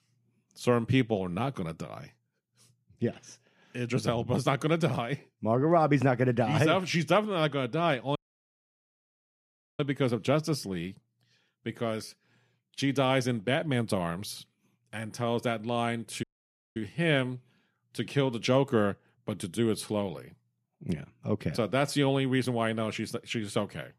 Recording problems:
audio cutting out; at 8 s for 1.5 s and at 16 s for 0.5 s

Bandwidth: 14.5 kHz